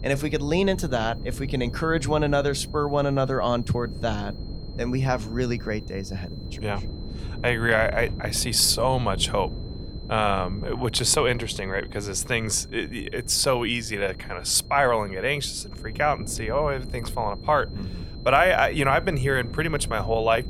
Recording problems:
wind noise on the microphone; occasional gusts; 20 dB below the speech
high-pitched whine; faint; throughout; 4 kHz, 25 dB below the speech

